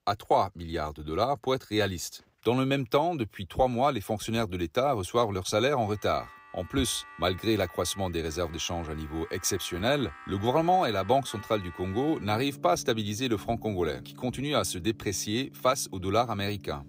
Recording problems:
background music; noticeable; from 6 s on; 20 dB below the speech

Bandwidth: 15.5 kHz